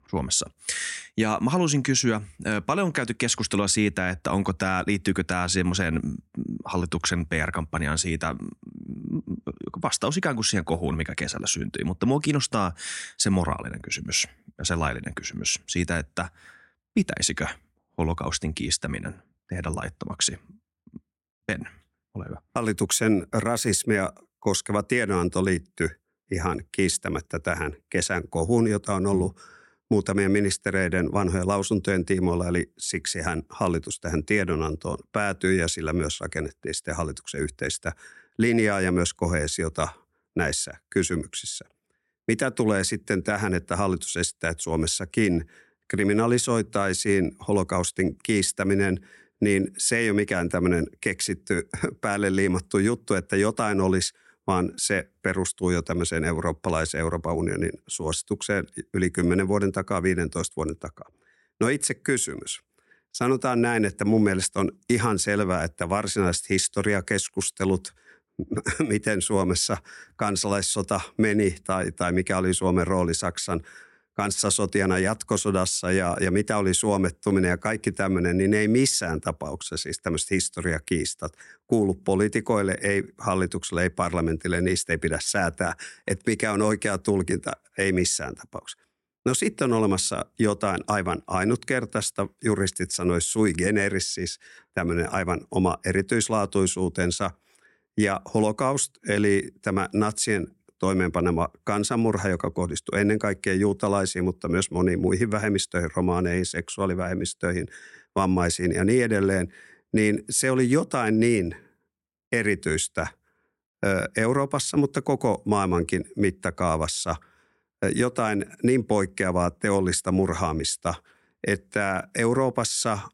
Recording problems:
none

